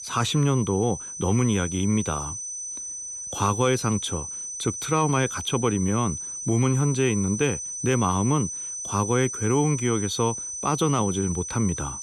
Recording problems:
high-pitched whine; loud; throughout; 6 kHz, 6 dB below the speech

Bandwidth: 14.5 kHz